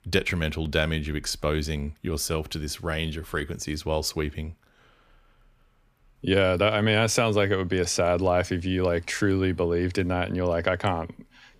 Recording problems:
none

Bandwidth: 15 kHz